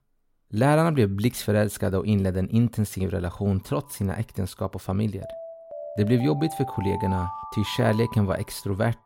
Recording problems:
alarms or sirens; noticeable; throughout; 10 dB below the speech

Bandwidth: 16.5 kHz